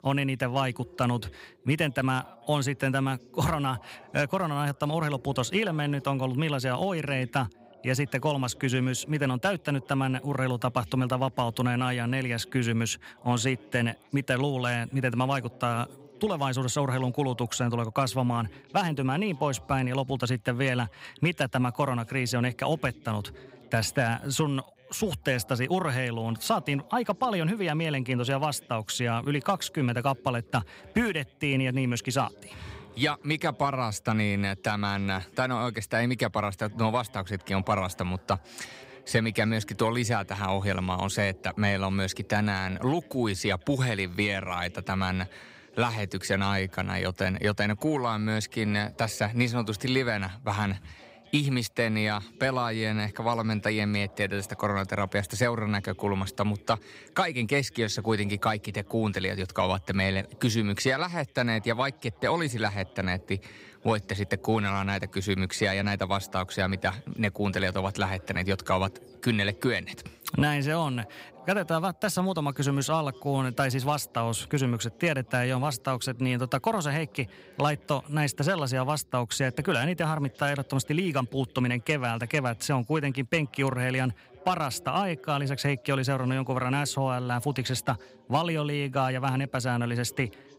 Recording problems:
background chatter; faint; throughout; 2 voices, 25 dB below the speech

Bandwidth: 15.5 kHz